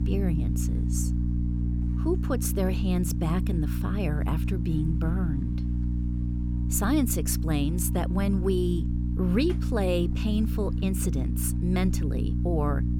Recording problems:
electrical hum; loud; throughout; 60 Hz, 7 dB below the speech

